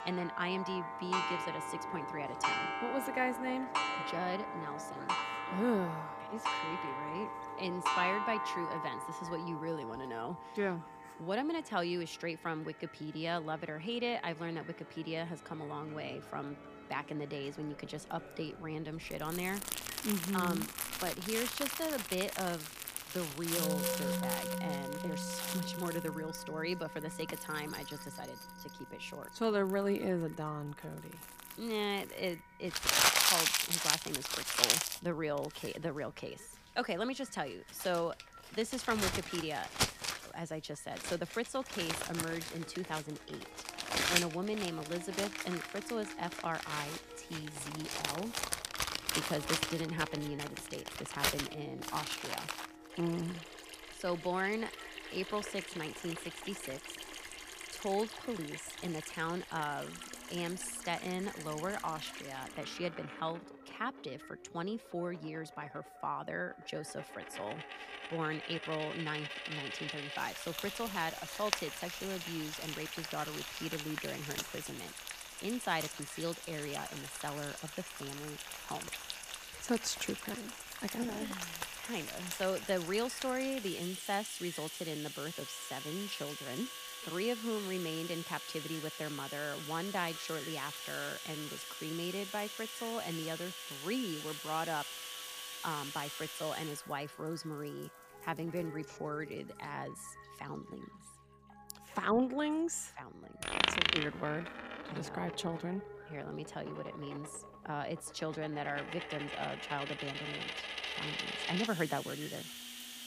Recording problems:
echo of what is said; faint; throughout; 130 ms later, 25 dB below the speech
household noises; very loud; throughout; 1 dB above the speech
background music; noticeable; throughout; 10 dB below the speech

